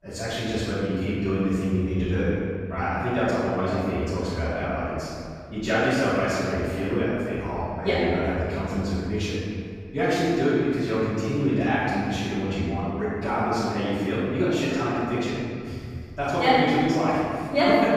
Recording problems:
room echo; strong; dies away in 2.2 s
off-mic speech; far

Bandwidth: 15.5 kHz